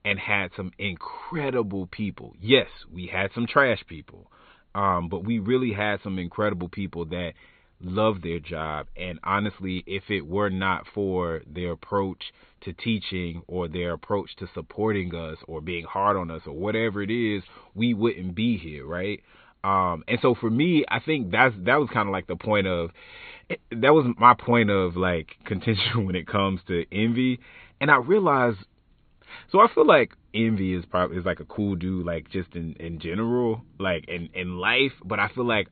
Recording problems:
high frequencies cut off; severe; nothing above 4 kHz

